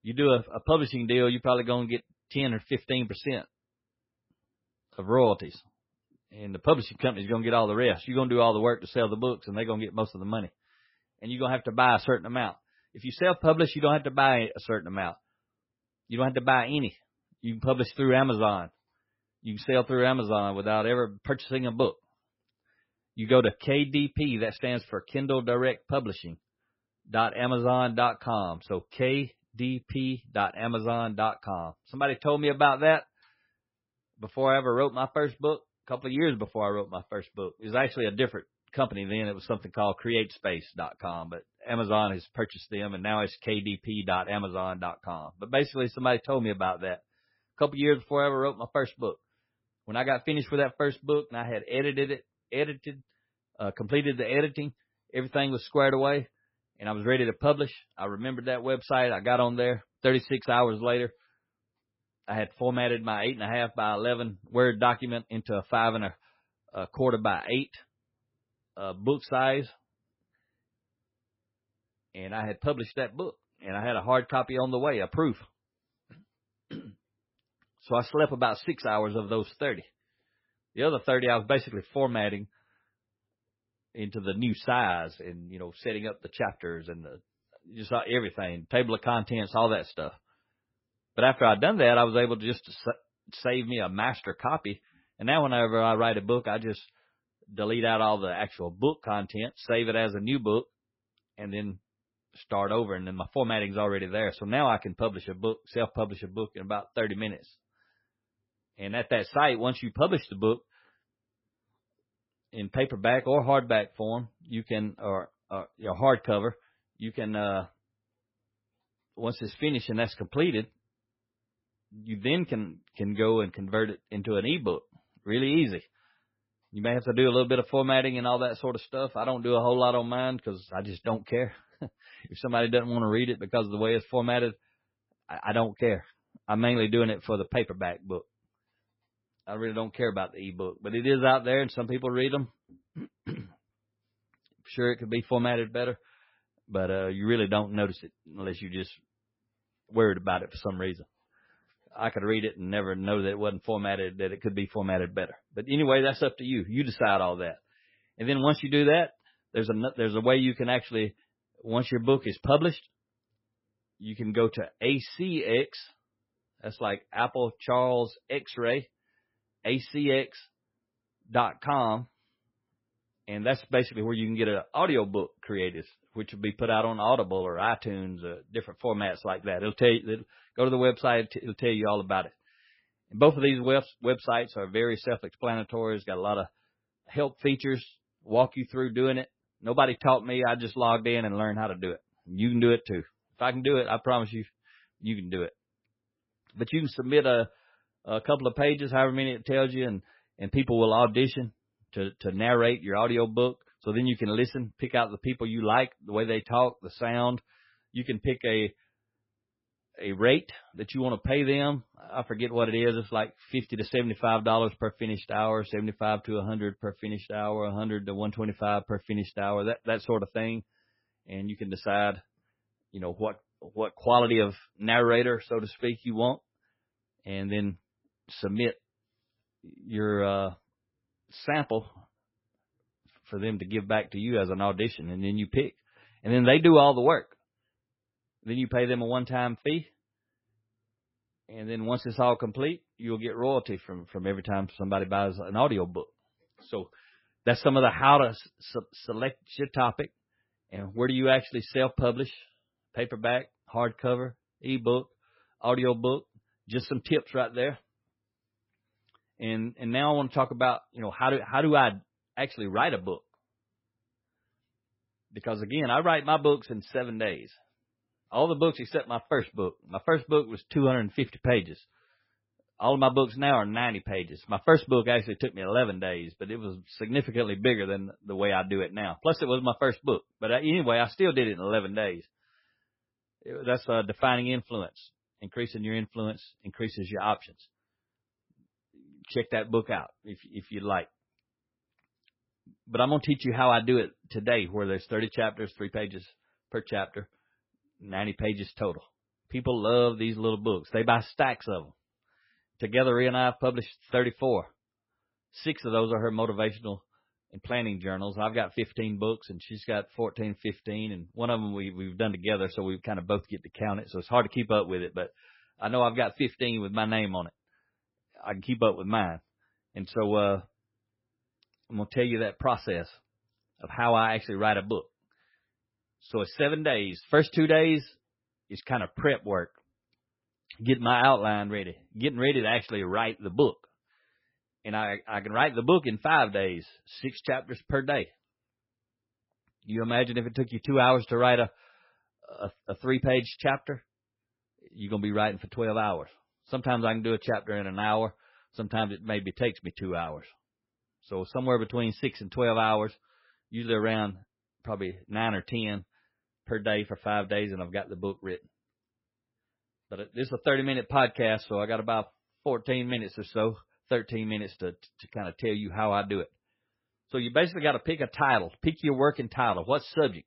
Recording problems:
garbled, watery; badly; nothing above 5.5 kHz

